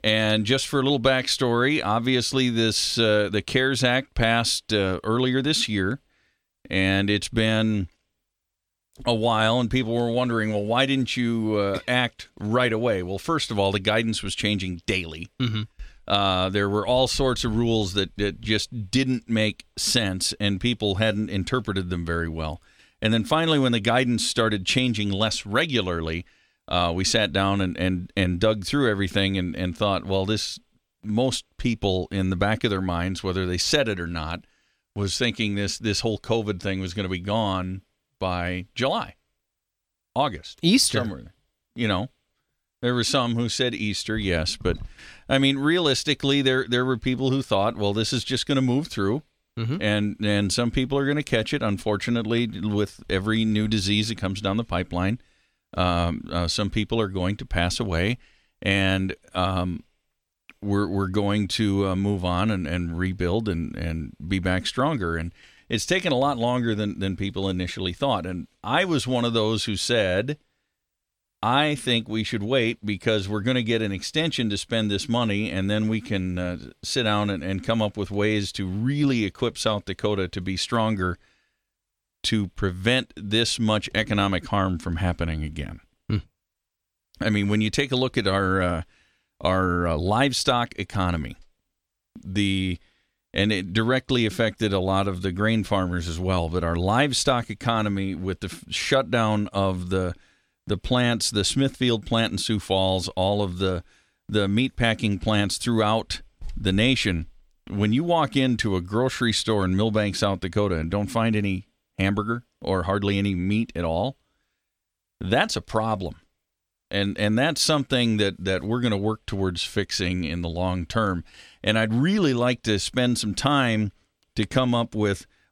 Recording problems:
none

